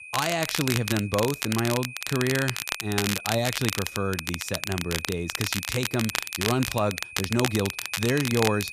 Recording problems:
crackle, like an old record; loud; 2 dB below the speech
high-pitched whine; noticeable; throughout; 2.5 kHz, 10 dB below the speech

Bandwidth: 14.5 kHz